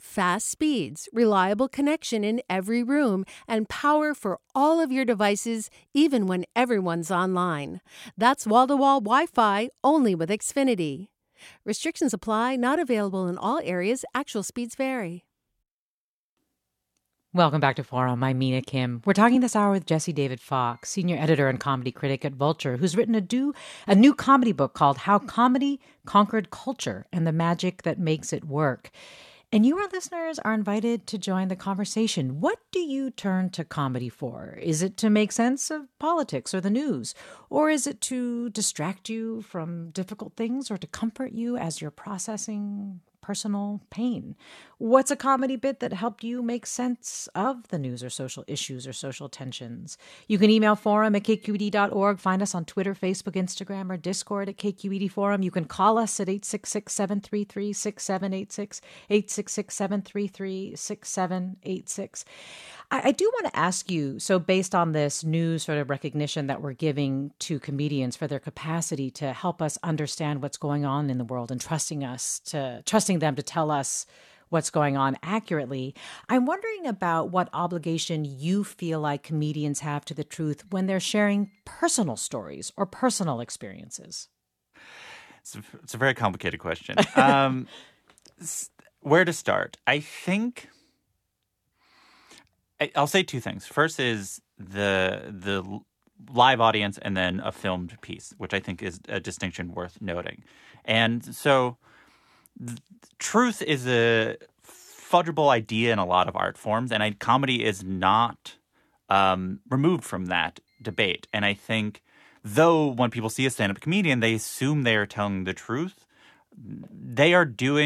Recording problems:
abrupt cut into speech; at the end

